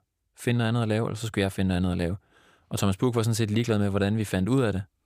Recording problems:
none

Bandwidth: 15 kHz